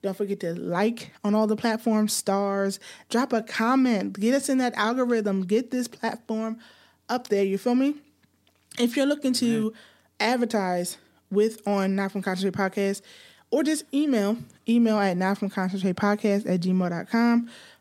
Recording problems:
none

